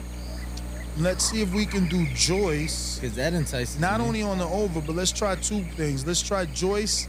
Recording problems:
electrical hum; noticeable; throughout; 60 Hz, 10 dB below the speech

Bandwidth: 15.5 kHz